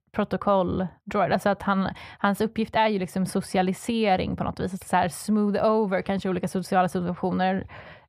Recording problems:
muffled; slightly; fading above 3.5 kHz

